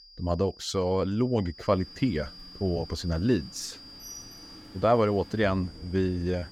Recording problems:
high-pitched whine; noticeable; throughout; 5 kHz, 20 dB below the speech
rain or running water; faint; from 1.5 s on; 20 dB below the speech

